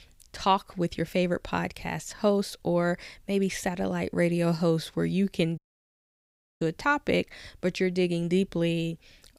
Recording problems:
audio cutting out; at 5.5 s for 1 s

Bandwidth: 15.5 kHz